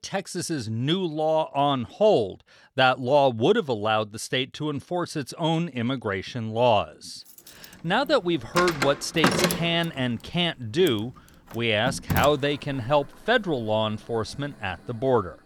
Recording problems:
household noises; loud; from 8 s on; 3 dB below the speech

